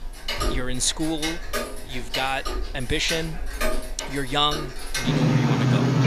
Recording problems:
household noises; very loud; throughout; as loud as the speech

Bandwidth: 14.5 kHz